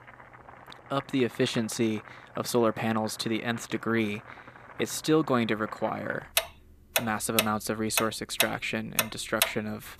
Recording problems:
household noises; loud; throughout; 1 dB below the speech

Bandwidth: 14.5 kHz